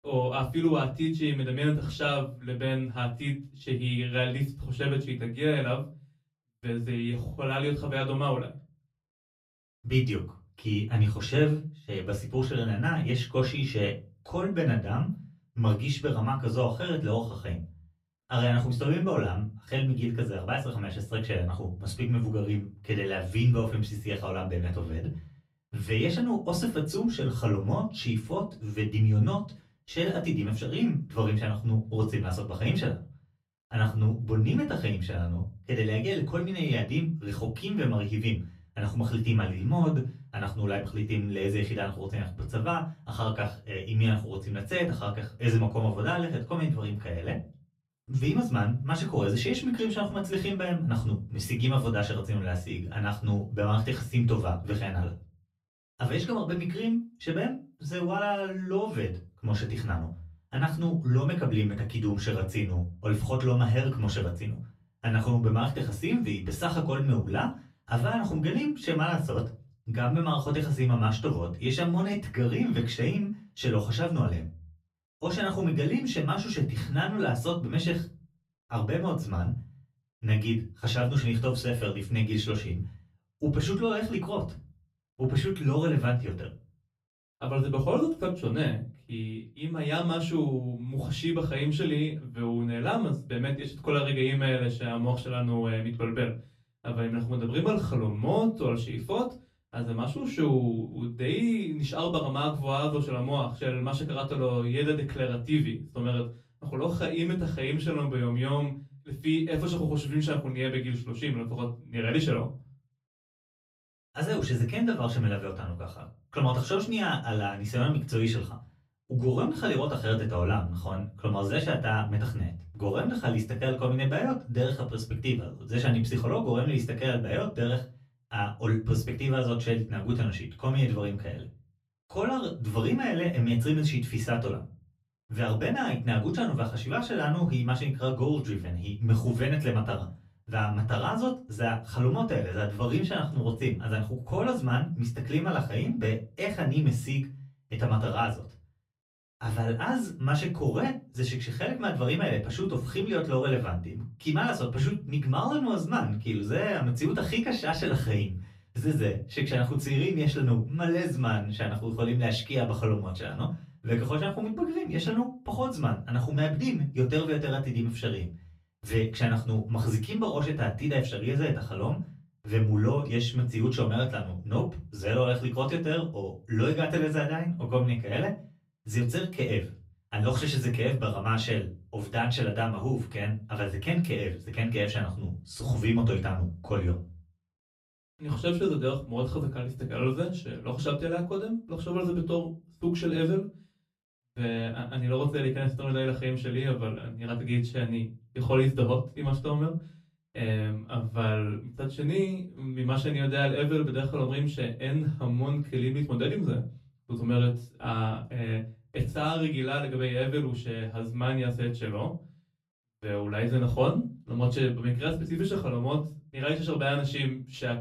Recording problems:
off-mic speech; far
room echo; very slight; dies away in 0.3 s

